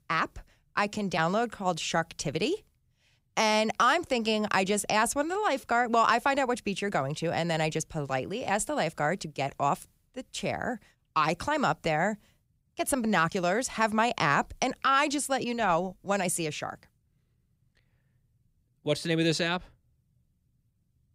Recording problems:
none

